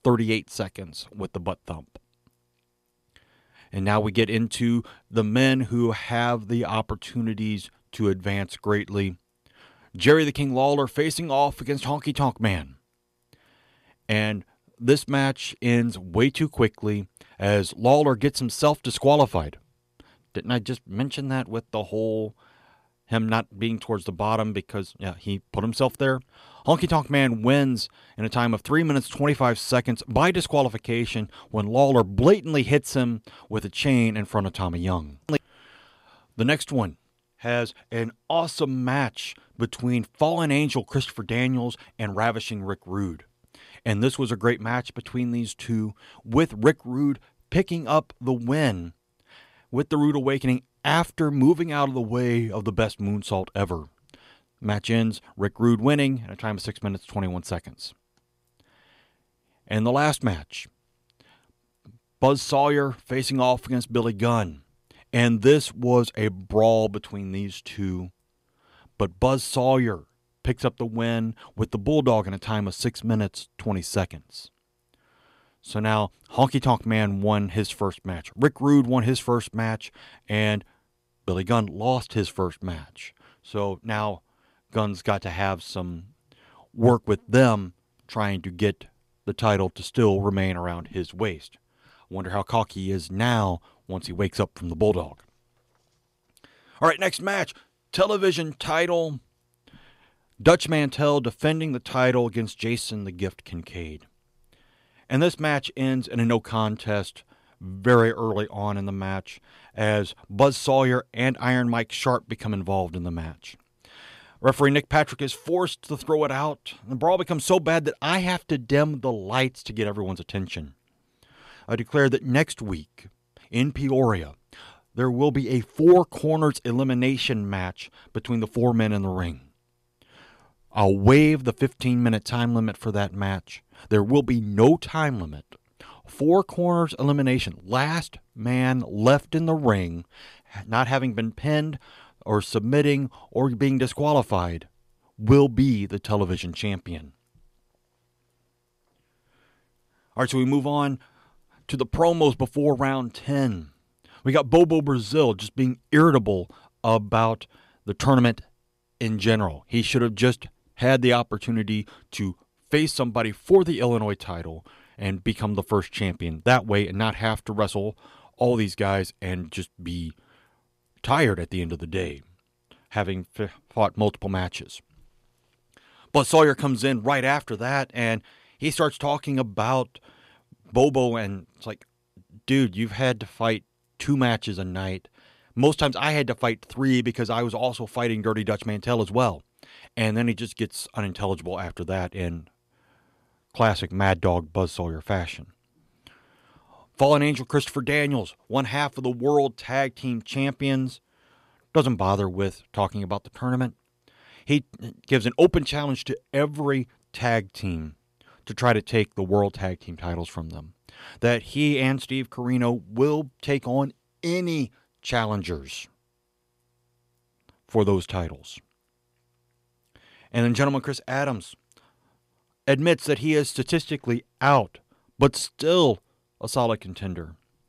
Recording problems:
none

